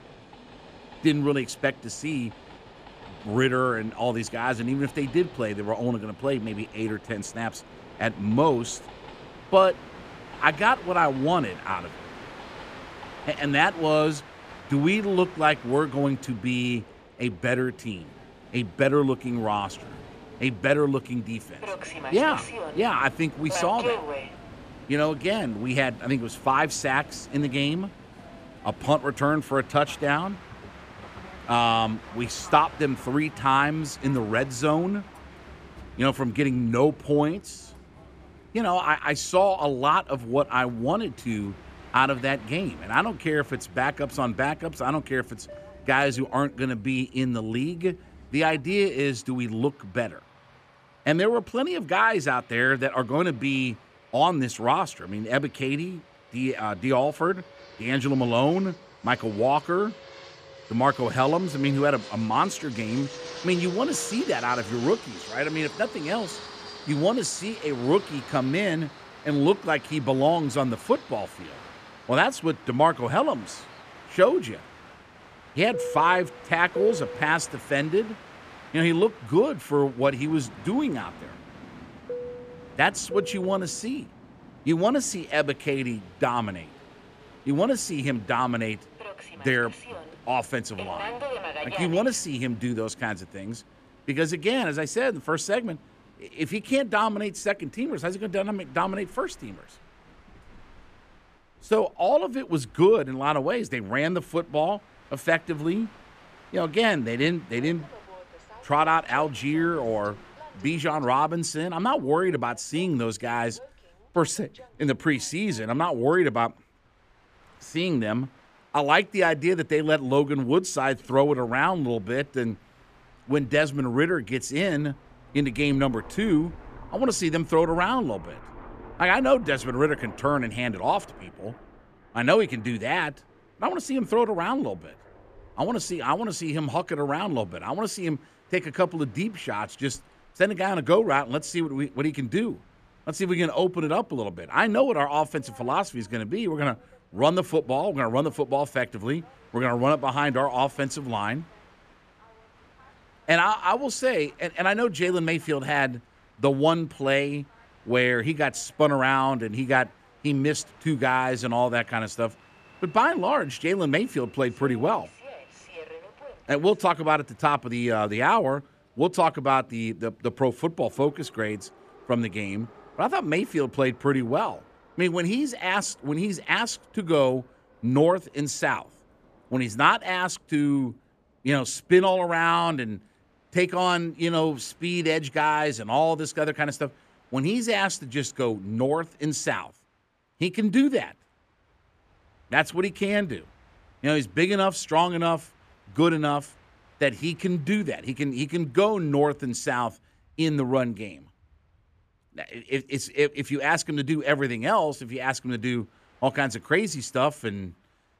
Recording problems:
train or aircraft noise; noticeable; throughout; 20 dB below the speech

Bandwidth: 14.5 kHz